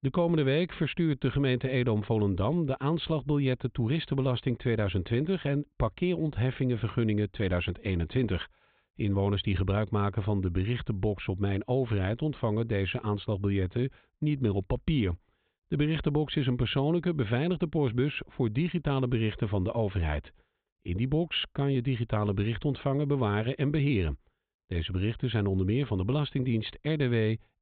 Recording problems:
high frequencies cut off; severe; nothing above 4 kHz

